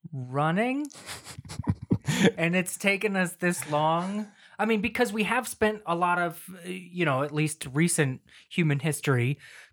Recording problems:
none

